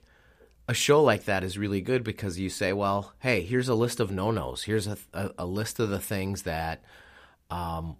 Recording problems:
none

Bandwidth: 15 kHz